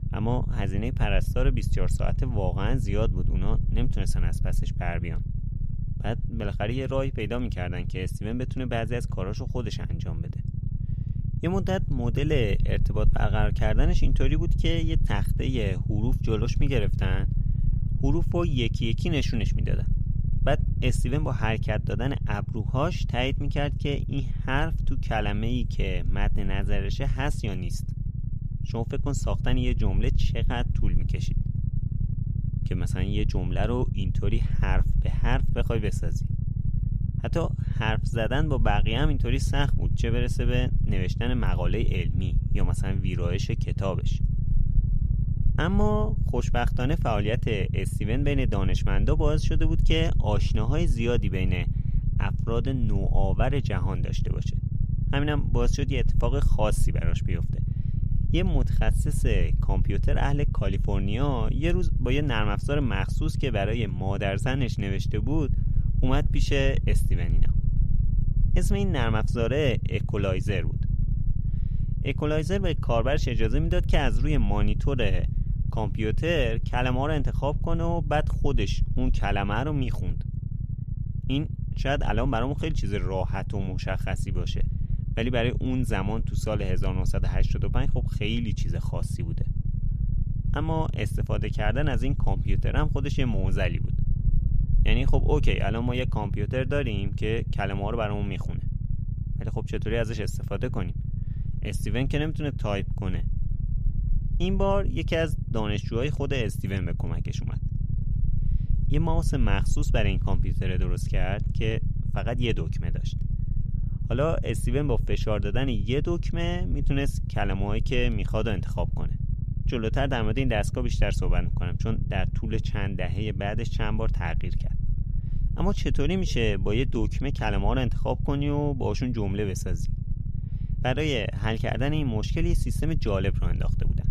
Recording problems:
low rumble; noticeable; throughout; 10 dB below the speech

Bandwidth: 15 kHz